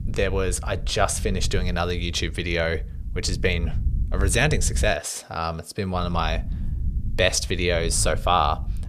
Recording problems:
low rumble; faint; until 5 s and from 6 s on; 25 dB below the speech

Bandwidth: 14.5 kHz